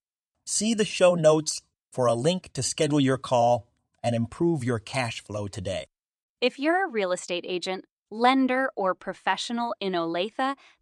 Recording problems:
none

